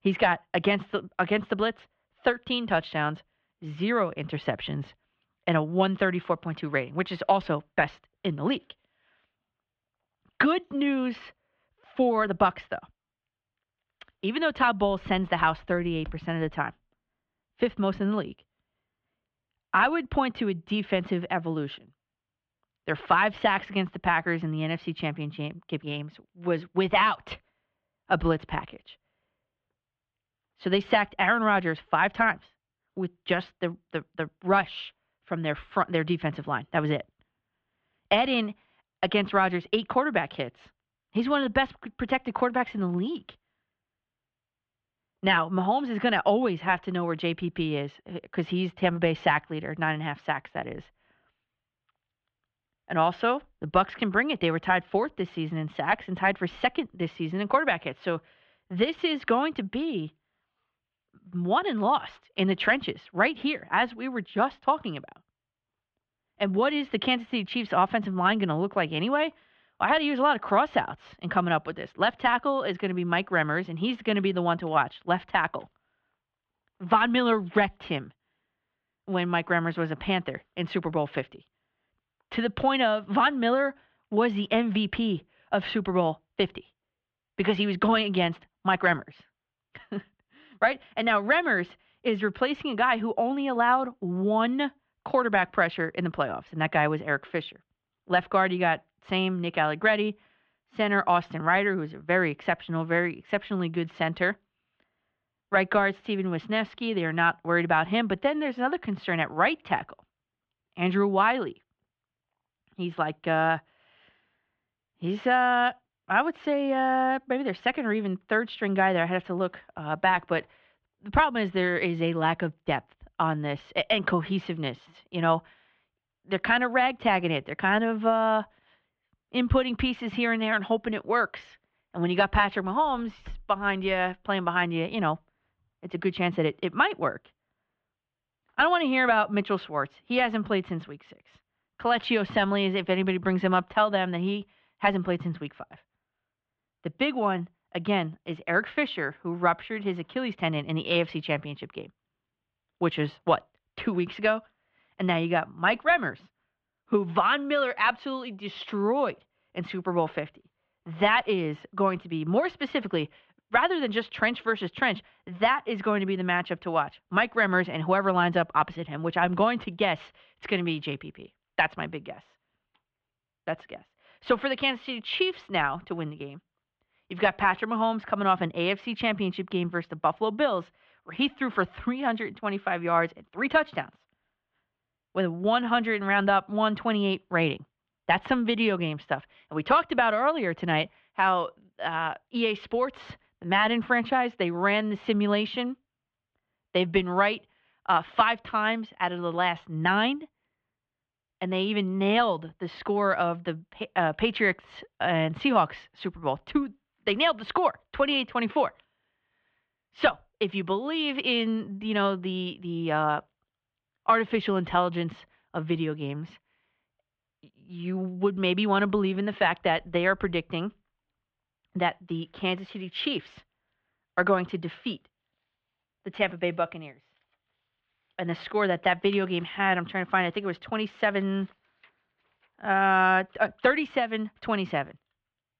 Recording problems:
muffled; very; fading above 3 kHz

